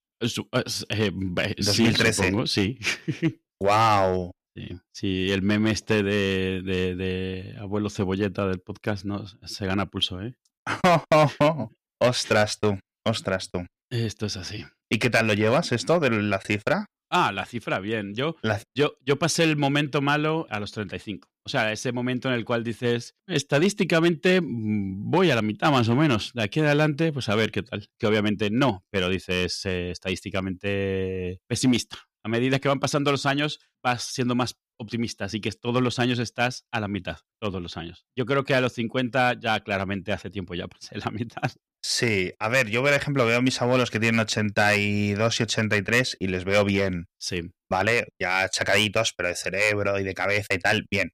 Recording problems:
distortion; slight; 2% of the sound clipped

